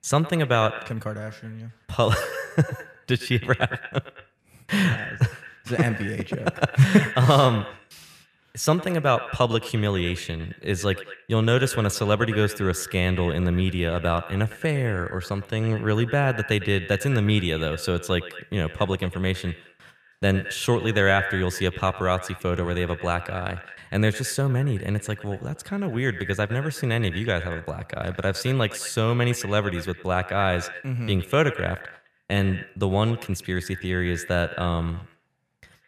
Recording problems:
echo of what is said; noticeable; throughout; 110 ms later, 15 dB below the speech

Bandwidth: 14.5 kHz